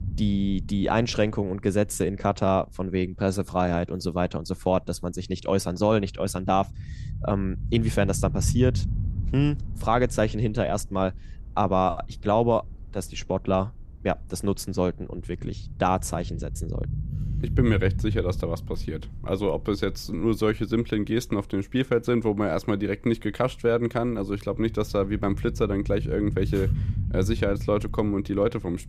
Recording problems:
low rumble; noticeable; throughout; 20 dB below the speech

